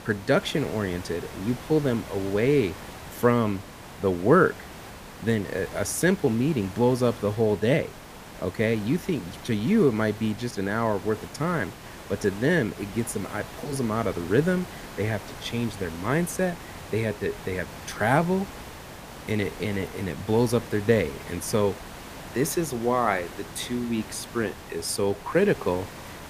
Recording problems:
hiss; noticeable; throughout; 15 dB below the speech

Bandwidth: 15 kHz